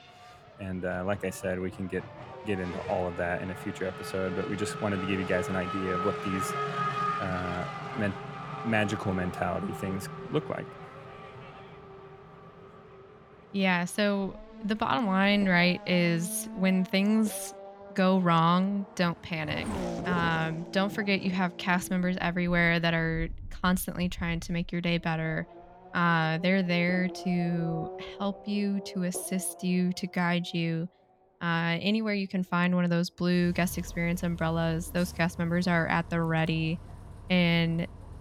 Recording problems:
traffic noise; noticeable; throughout; 10 dB below the speech

